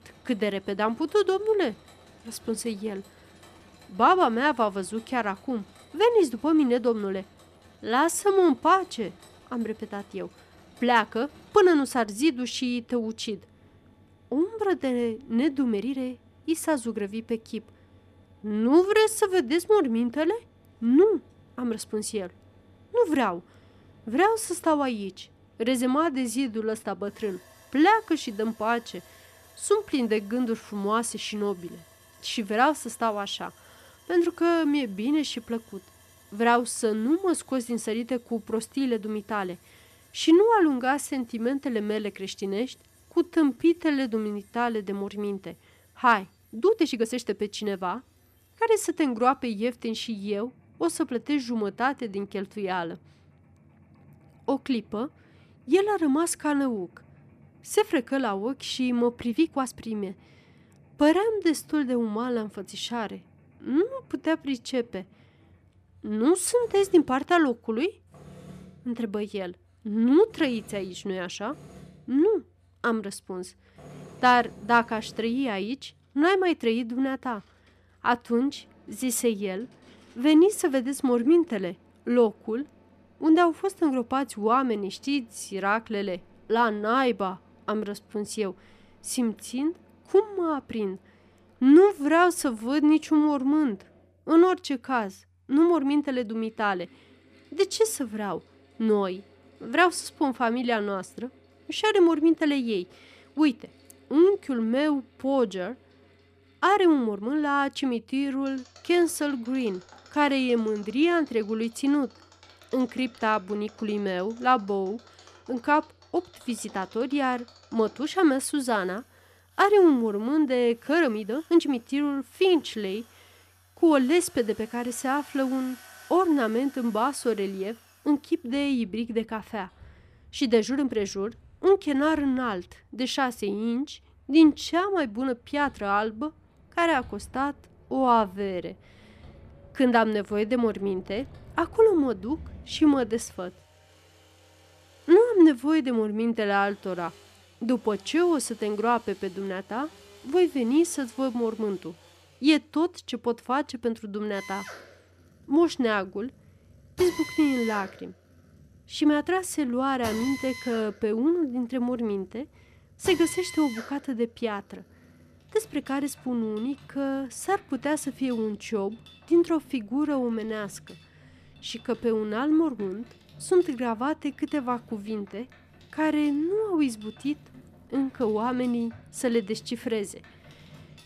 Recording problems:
machinery noise; faint; throughout; 25 dB below the speech
uneven, jittery; strongly; from 7.5 s to 2:23

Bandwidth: 14.5 kHz